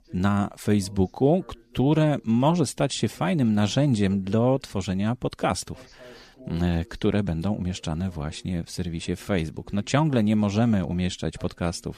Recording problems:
voice in the background; faint; throughout; 25 dB below the speech

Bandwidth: 14.5 kHz